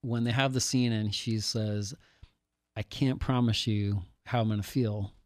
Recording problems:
none

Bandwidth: 14.5 kHz